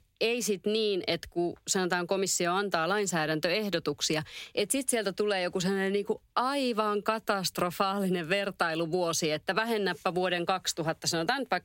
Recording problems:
squashed, flat; somewhat

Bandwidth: 16 kHz